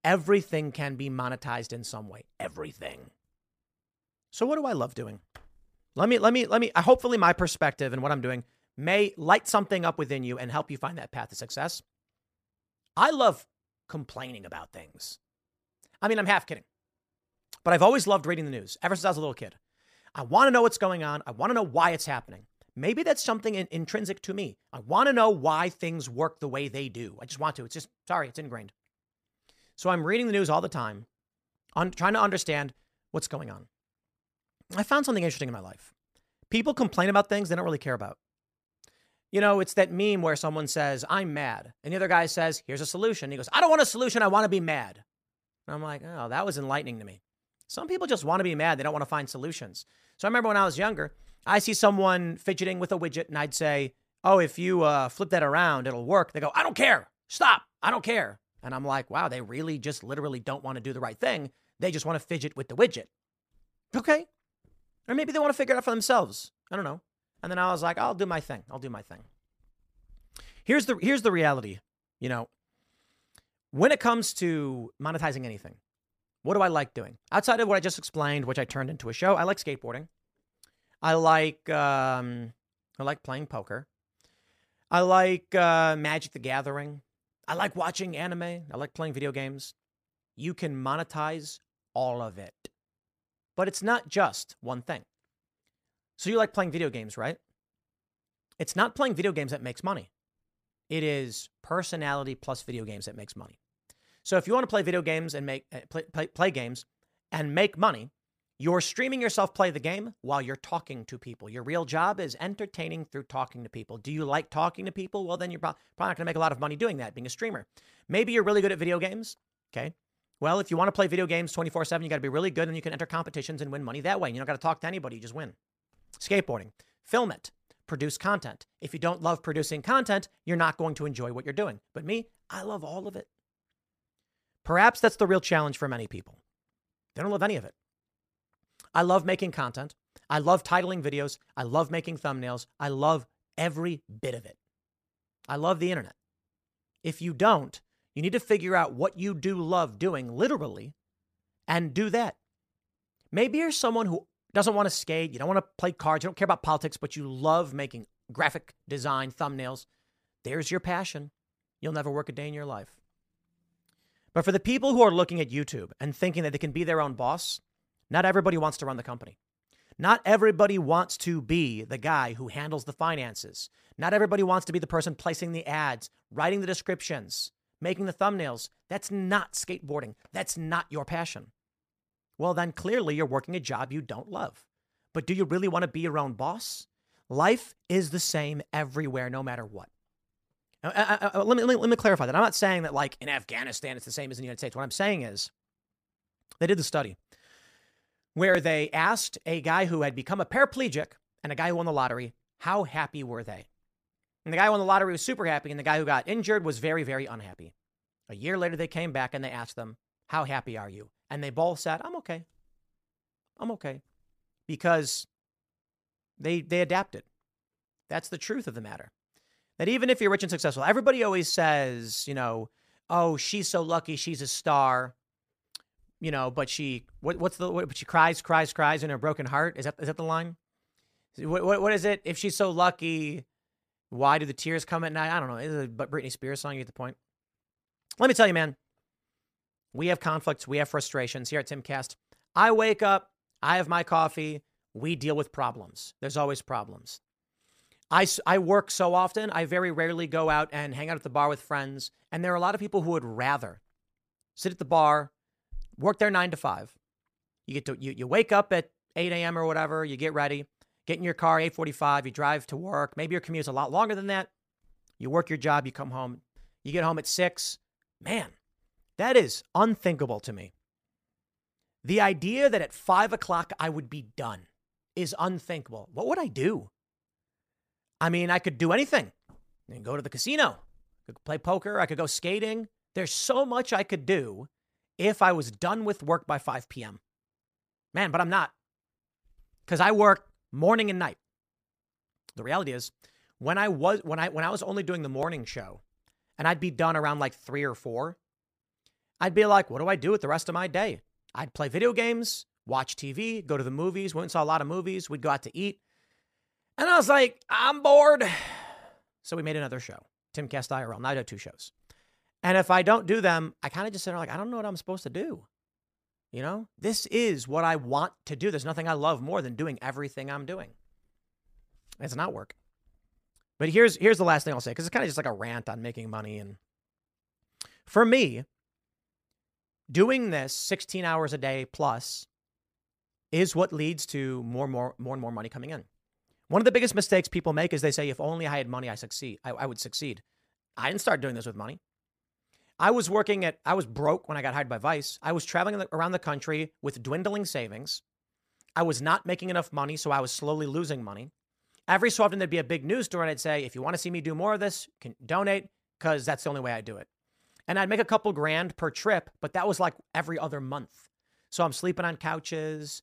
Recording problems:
none

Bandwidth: 15 kHz